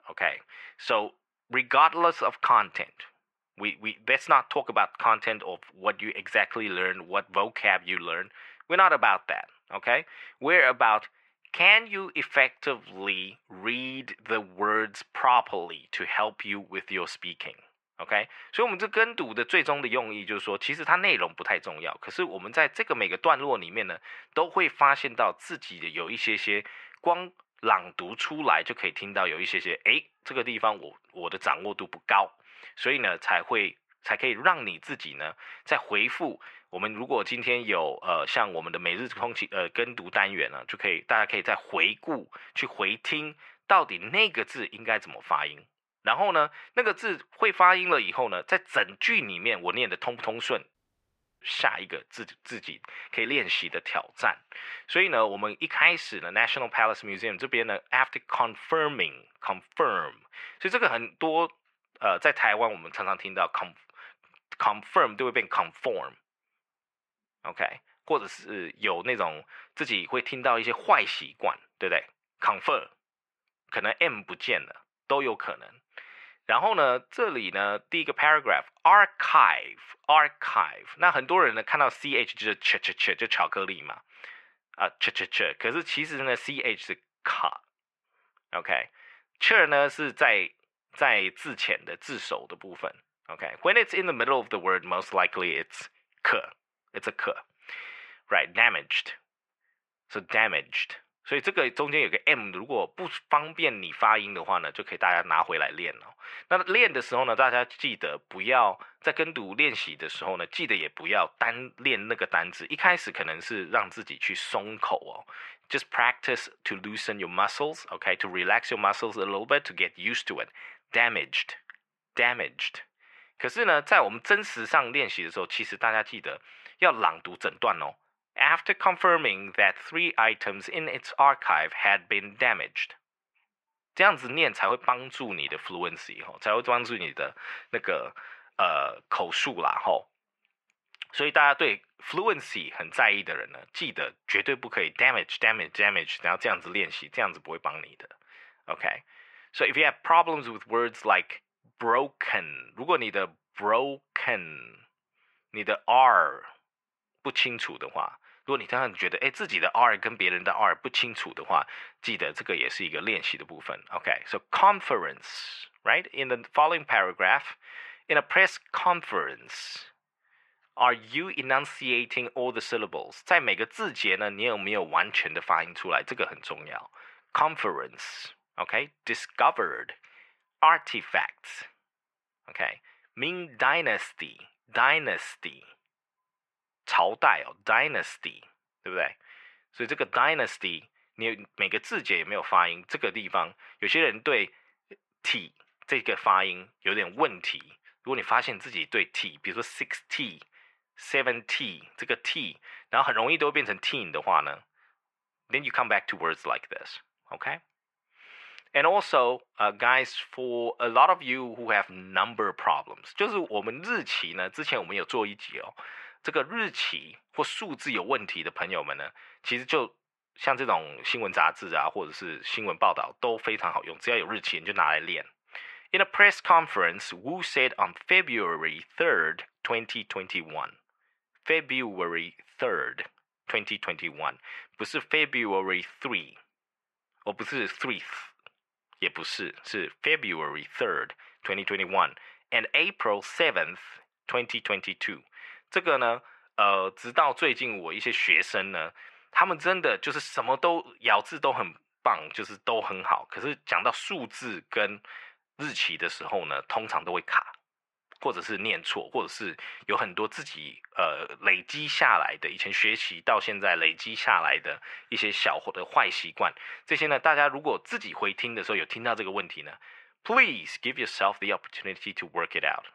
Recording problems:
muffled; very; fading above 1.5 kHz
thin; very; fading below 650 Hz
audio cutting out; at 51 s for 0.5 s

